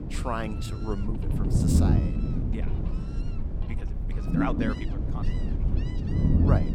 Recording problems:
low rumble; loud; throughout; 1 dB below the speech
animal sounds; noticeable; throughout; 15 dB below the speech
uneven, jittery; strongly; from 0.5 to 5.5 s

